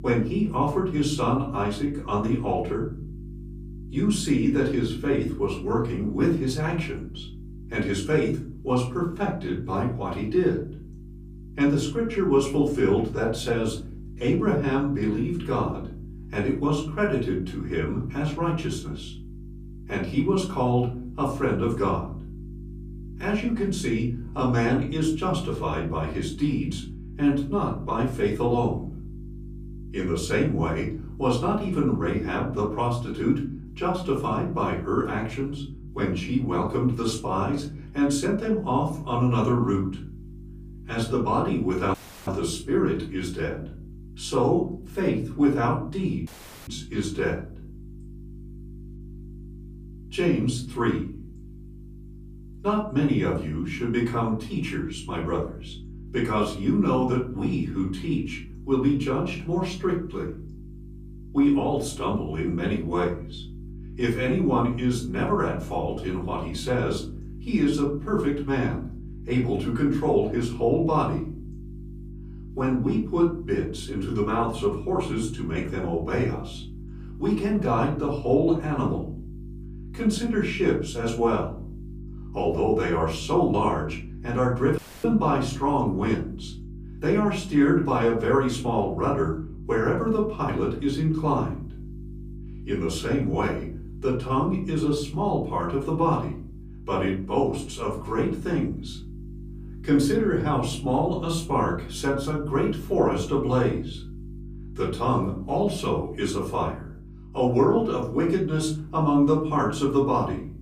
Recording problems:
off-mic speech; far
room echo; slight; dies away in 0.5 s
electrical hum; faint; throughout; 50 Hz, 25 dB below the speech
audio cutting out; at 42 s, at 46 s and at 1:25

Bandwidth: 15 kHz